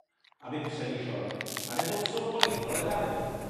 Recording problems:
room echo; strong; dies away in 2.7 s
off-mic speech; far
household noises; very loud; throughout; as loud as the speech
crackling; loud; at 1.5 s; 5 dB below the speech

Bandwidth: 13.5 kHz